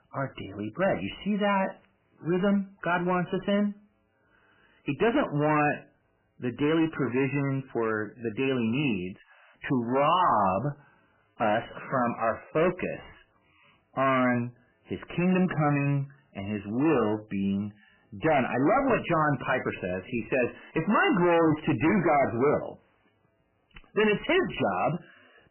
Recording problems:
distortion; heavy; 10% of the sound clipped
garbled, watery; badly; nothing above 3 kHz

